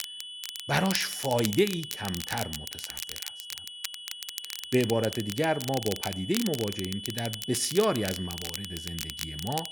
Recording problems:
high-pitched whine; loud; throughout; 3 kHz, 10 dB below the speech
crackle, like an old record; loud; 8 dB below the speech

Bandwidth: 18.5 kHz